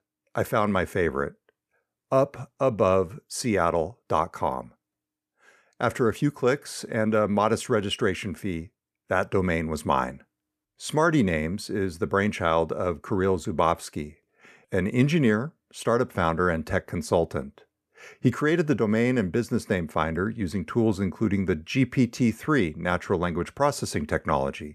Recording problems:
none

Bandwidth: 14.5 kHz